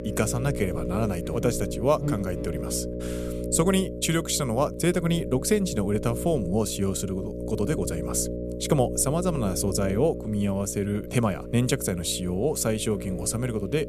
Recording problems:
electrical hum; loud; throughout; 60 Hz, 8 dB below the speech

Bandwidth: 14.5 kHz